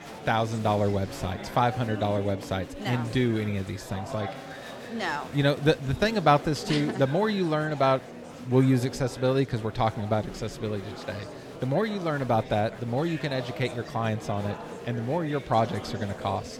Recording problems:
murmuring crowd; noticeable; throughout; 10 dB below the speech

